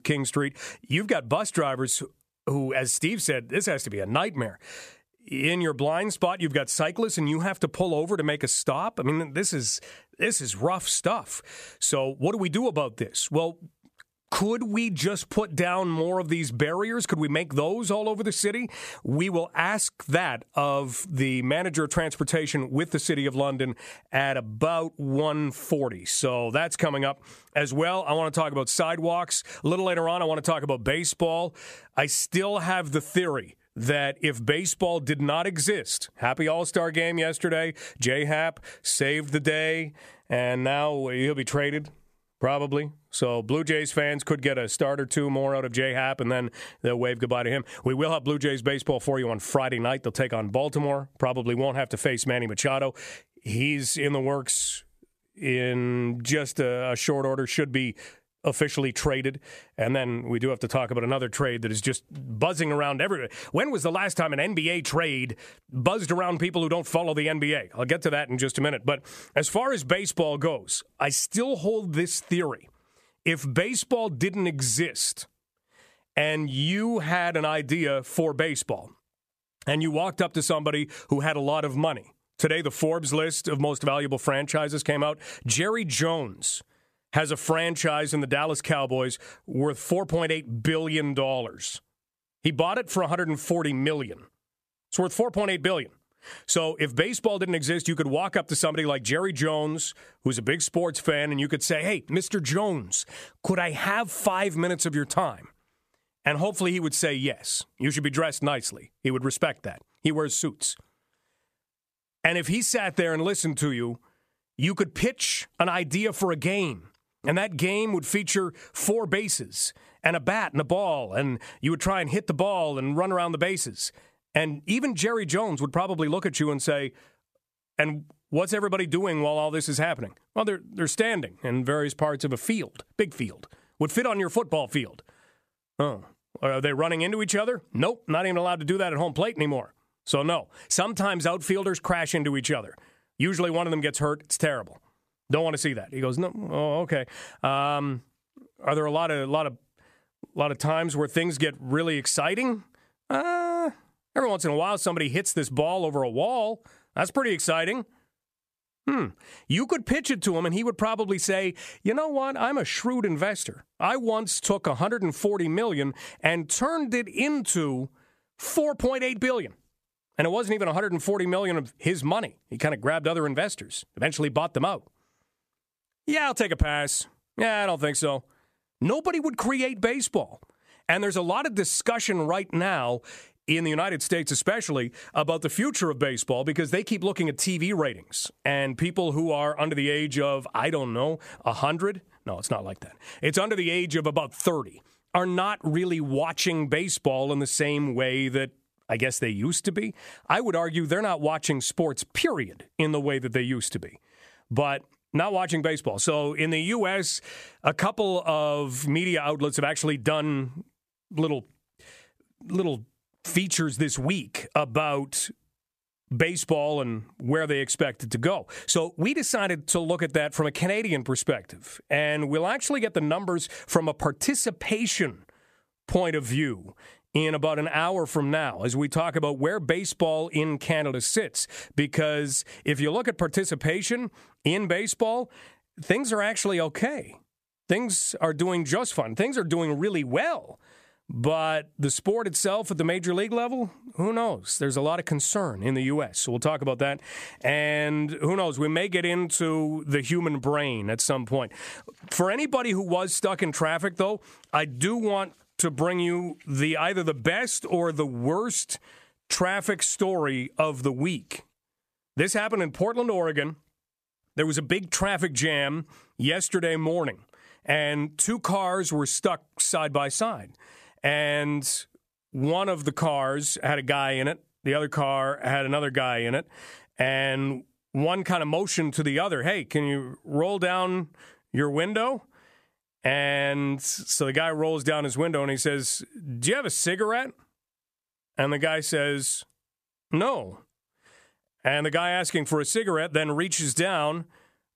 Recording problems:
squashed, flat; somewhat

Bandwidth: 14.5 kHz